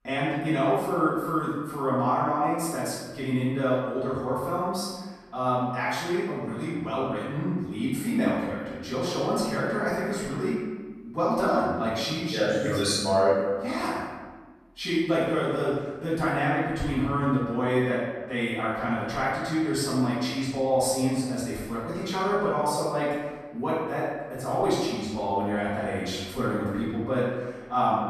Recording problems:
room echo; strong; dies away in 1.2 s
off-mic speech; far

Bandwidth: 14.5 kHz